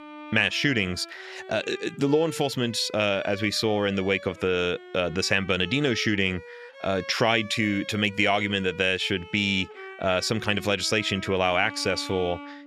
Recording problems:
background music; noticeable; throughout; 15 dB below the speech

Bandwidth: 14 kHz